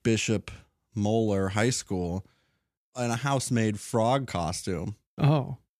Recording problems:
none

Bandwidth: 14.5 kHz